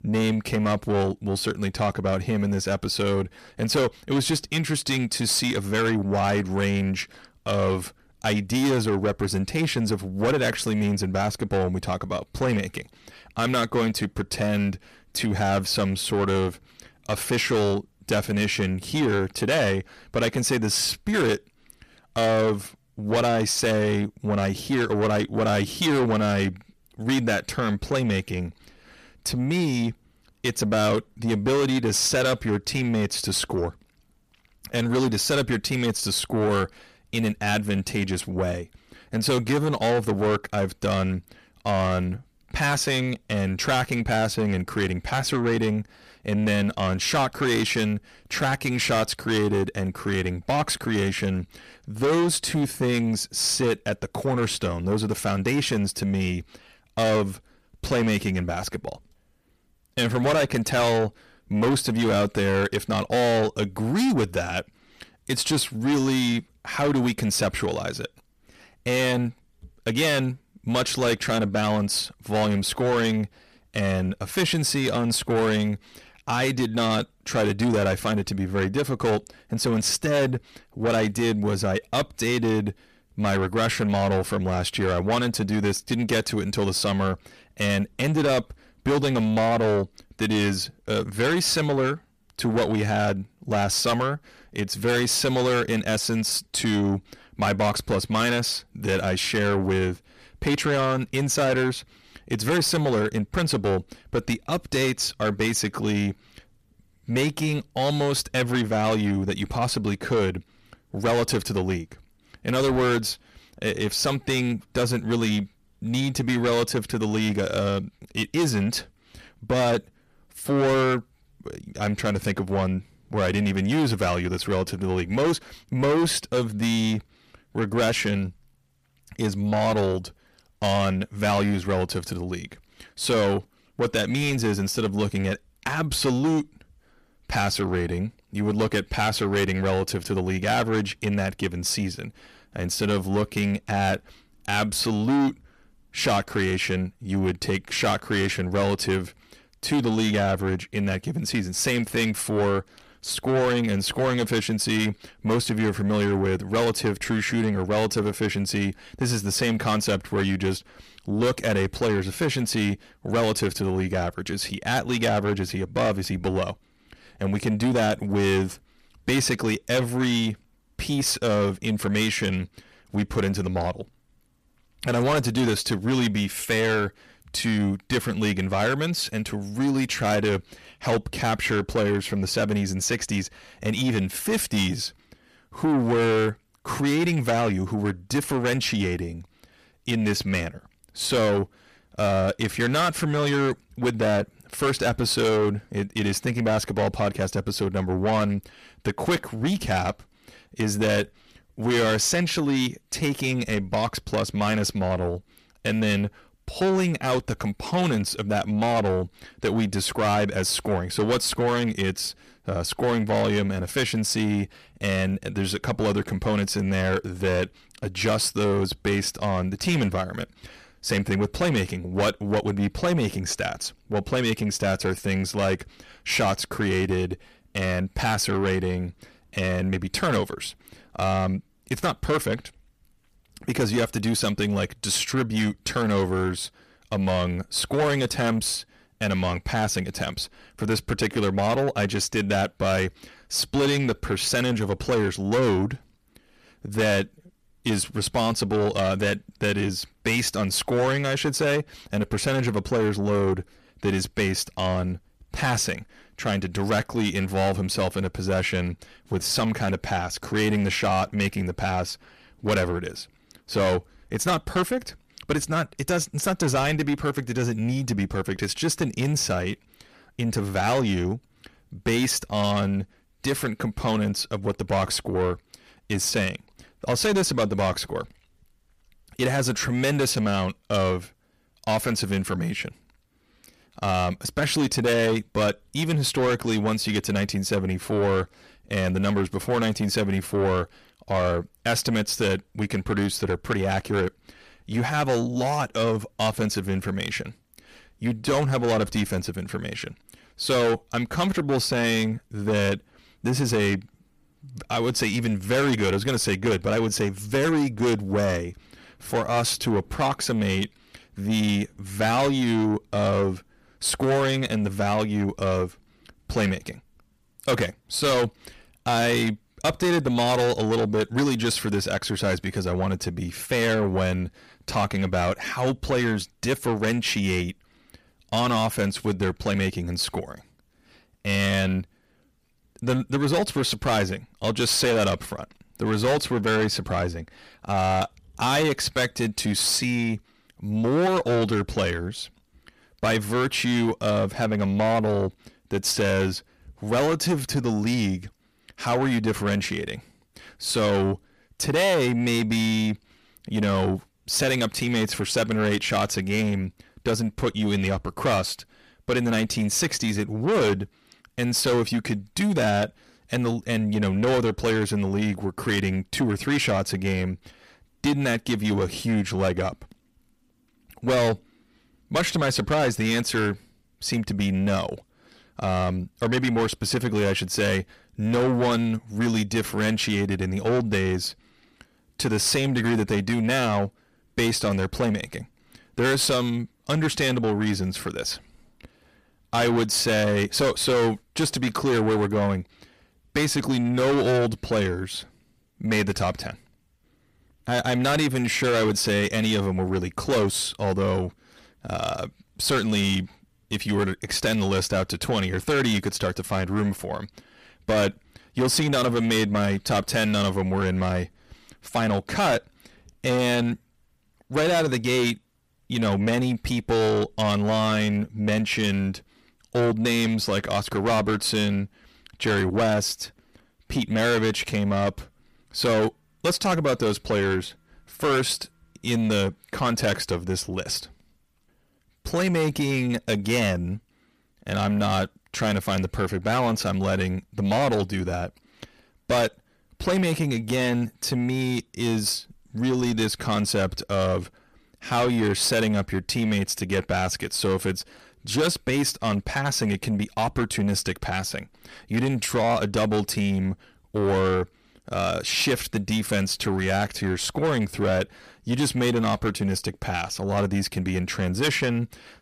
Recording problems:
distortion; heavy; 7 dB below the speech

